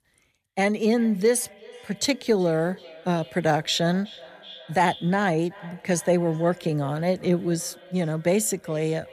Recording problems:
echo of what is said; faint; throughout; 370 ms later, 20 dB below the speech

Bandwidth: 14 kHz